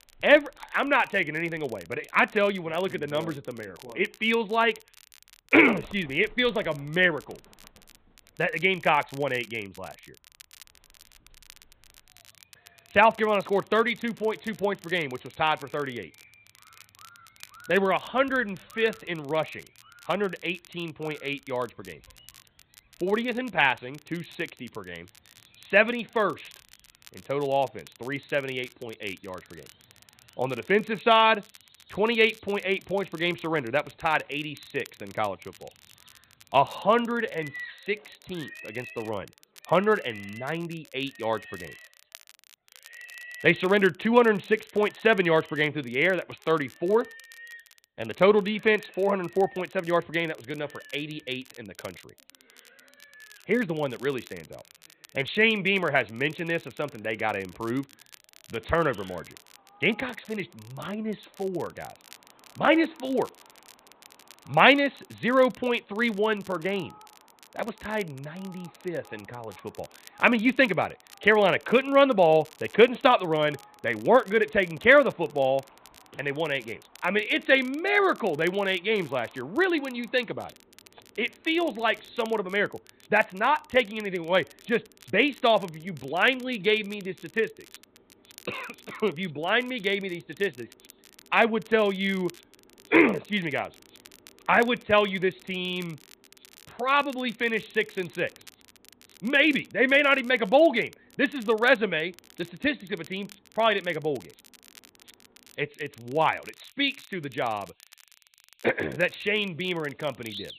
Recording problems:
high frequencies cut off; severe; nothing above 4 kHz
animal sounds; faint; throughout; 25 dB below the speech
crackle, like an old record; faint; 25 dB below the speech

